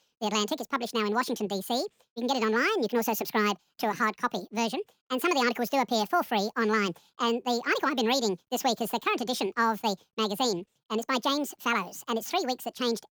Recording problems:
wrong speed and pitch; too fast and too high; 1.7 times normal speed

